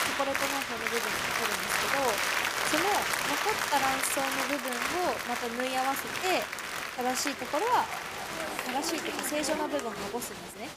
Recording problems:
crowd noise; very loud; throughout; 2 dB above the speech
dog barking; faint; from 7.5 to 9 s; peak 10 dB below the speech

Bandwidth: 15 kHz